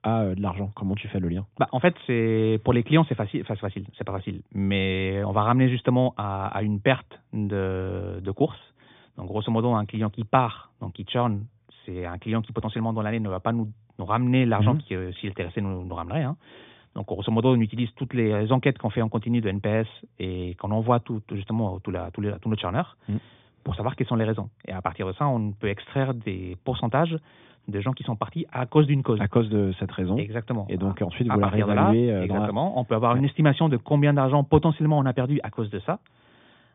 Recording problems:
high frequencies cut off; severe; nothing above 3.5 kHz

